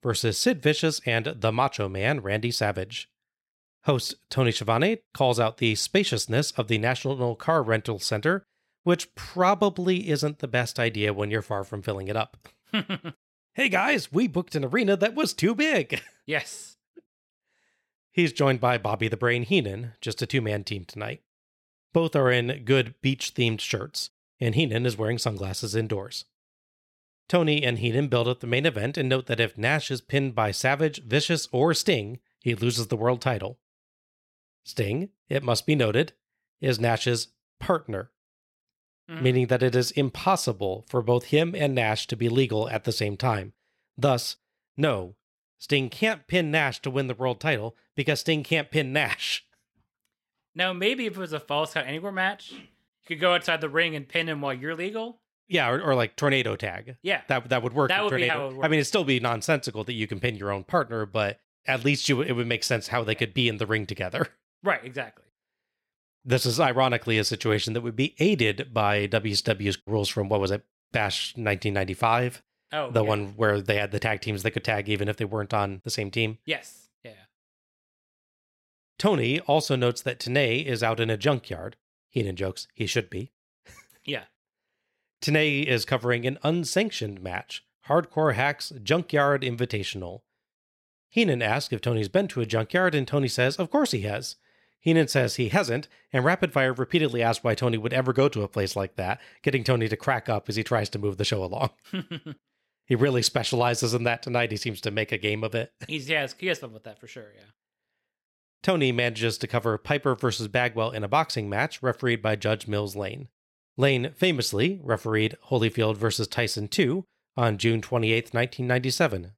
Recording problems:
none

